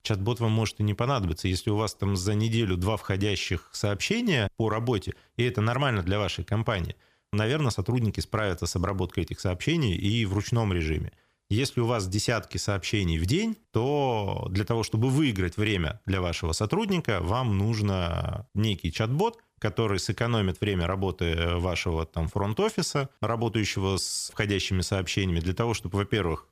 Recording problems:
none

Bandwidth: 15 kHz